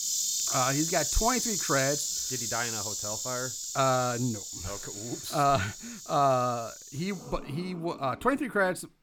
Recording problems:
animal sounds; loud; throughout; 1 dB below the speech

